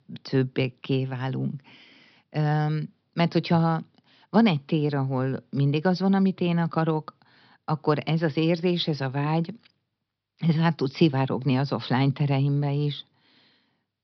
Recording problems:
high frequencies cut off; noticeable; nothing above 5.5 kHz

